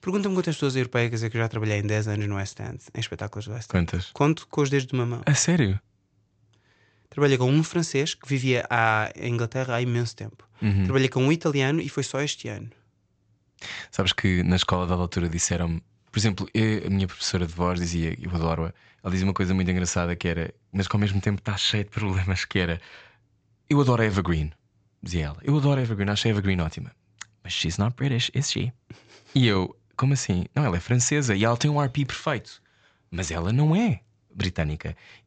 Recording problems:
high frequencies cut off; noticeable; nothing above 8 kHz

